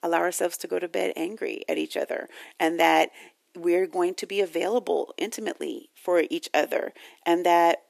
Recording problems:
thin; somewhat; fading below 300 Hz

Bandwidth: 14 kHz